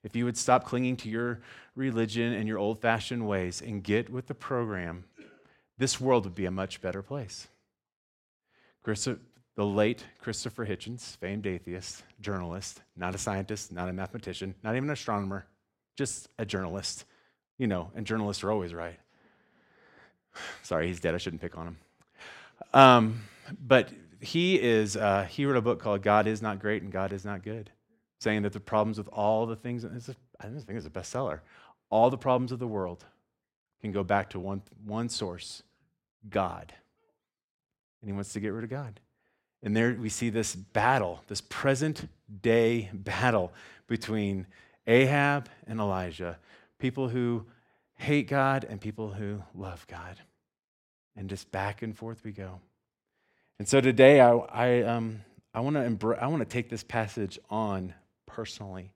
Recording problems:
none

